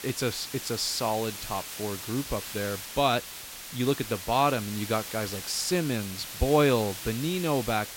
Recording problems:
hiss; loud; throughout; 8 dB below the speech

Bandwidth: 16.5 kHz